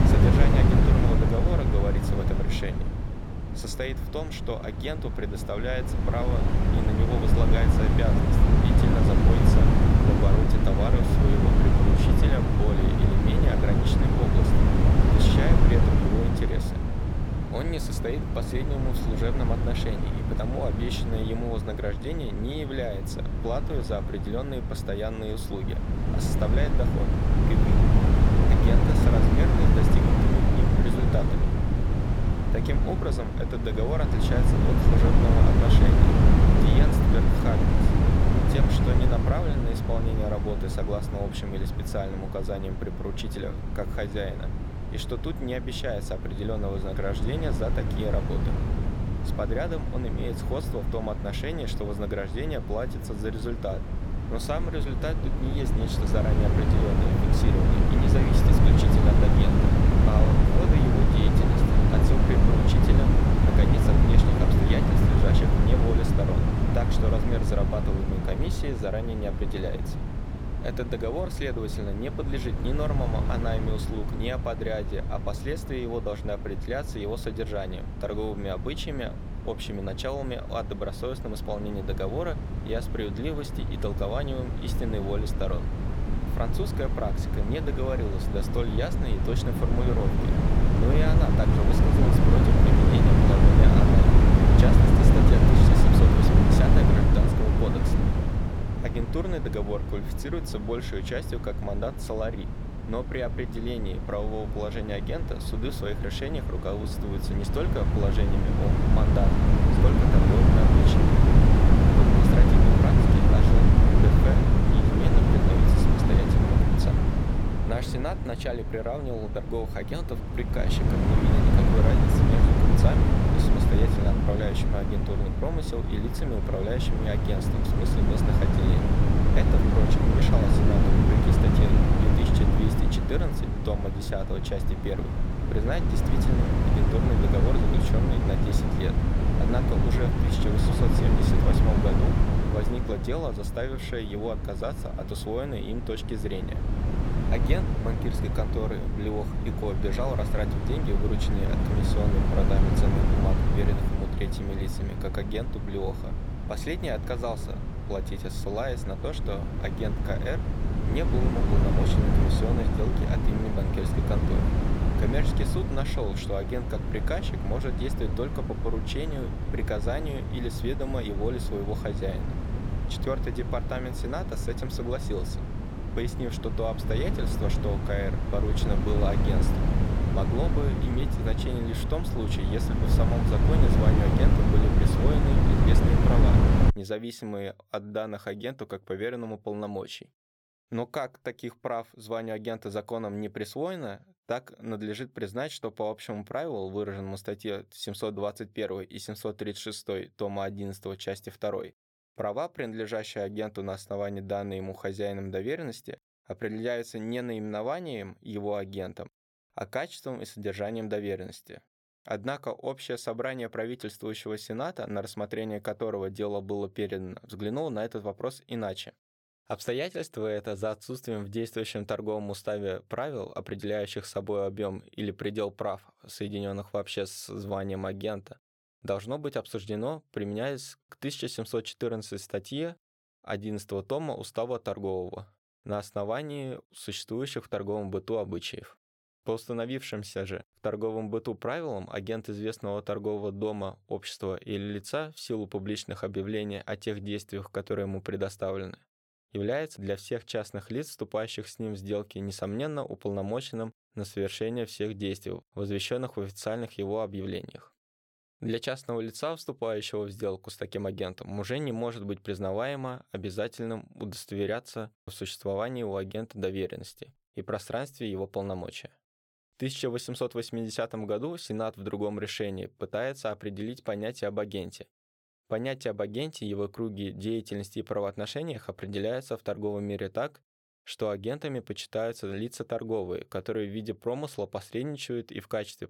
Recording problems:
wind noise on the microphone; heavy; until 3:07; 2 dB above the speech

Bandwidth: 17 kHz